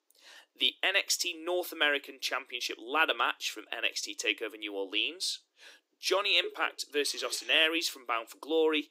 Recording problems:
thin; very; fading below 300 Hz

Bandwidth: 15.5 kHz